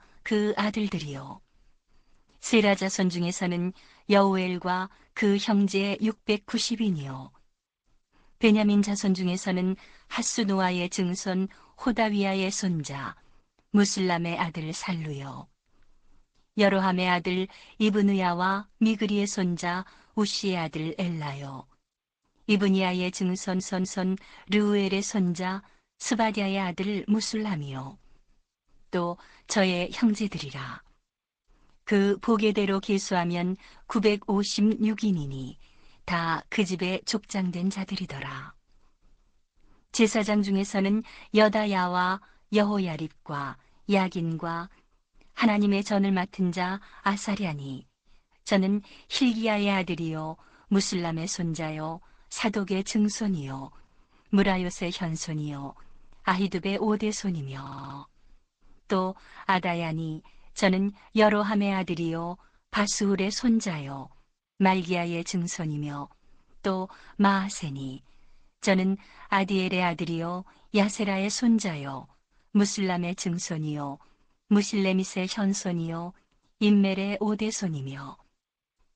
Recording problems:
garbled, watery; slightly; nothing above 8 kHz
audio stuttering; at 23 s and at 58 s

